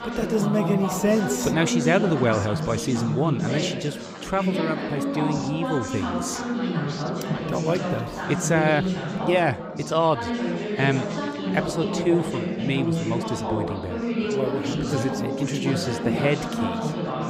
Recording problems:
chatter from many people; loud; throughout; 2 dB below the speech

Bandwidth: 15.5 kHz